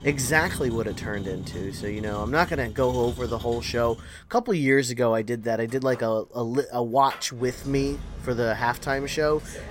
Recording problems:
traffic noise; noticeable; throughout; 10 dB below the speech

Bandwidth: 16 kHz